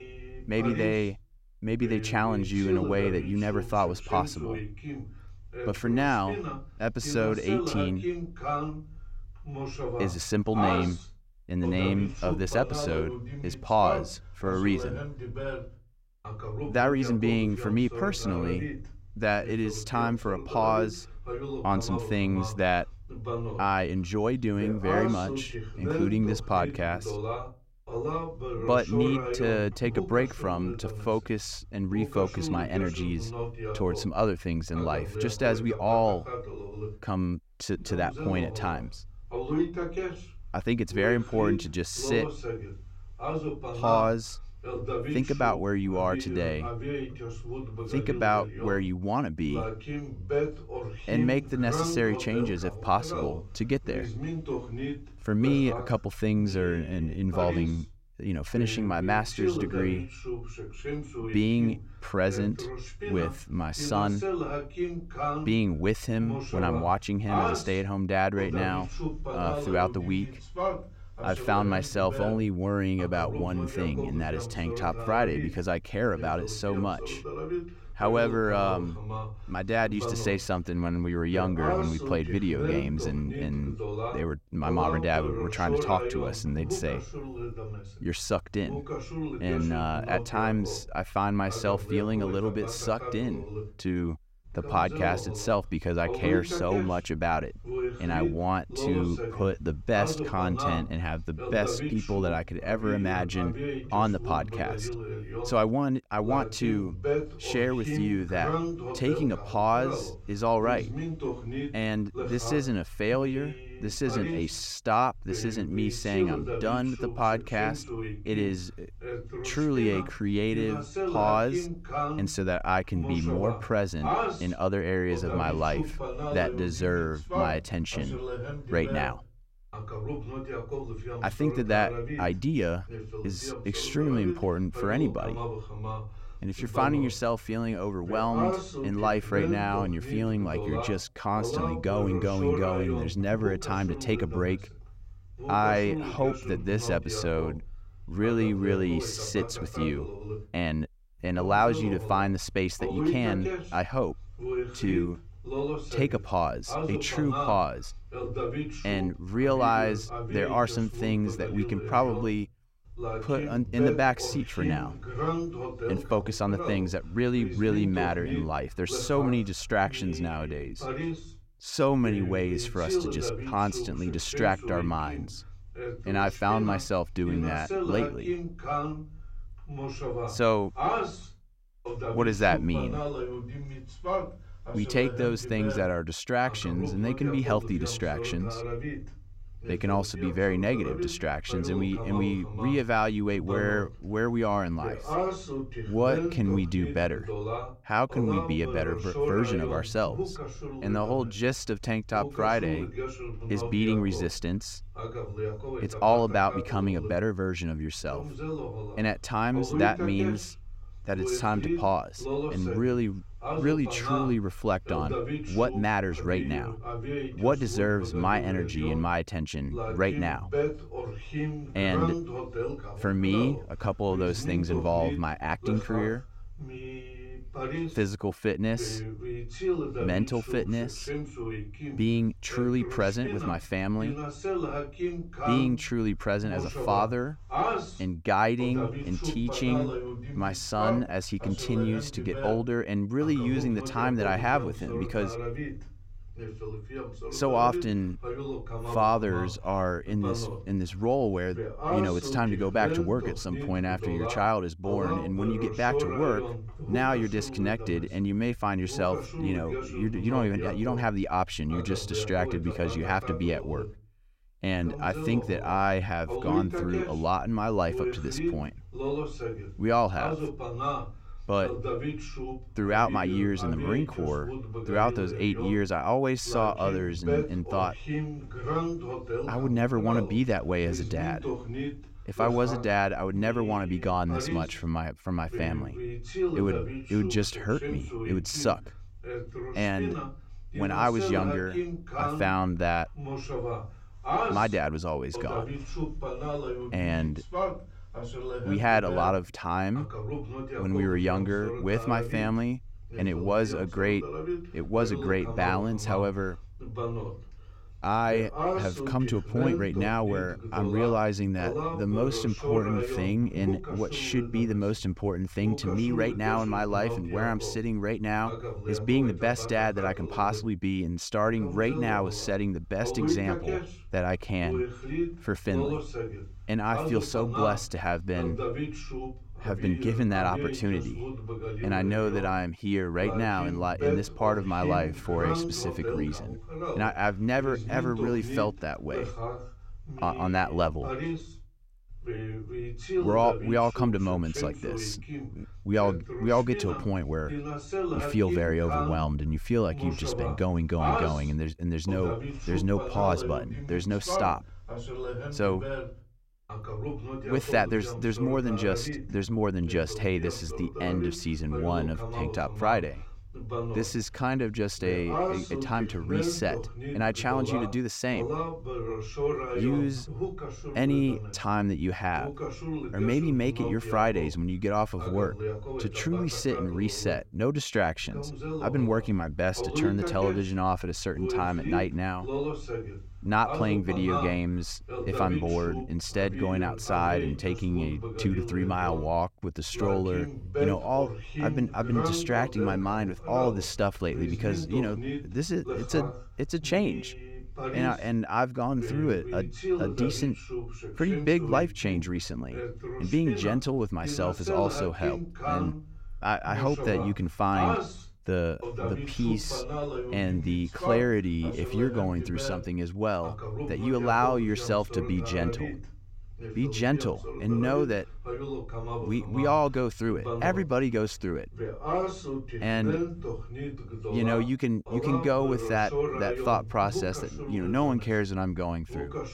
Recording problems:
voice in the background; loud; throughout; 6 dB below the speech

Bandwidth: 16 kHz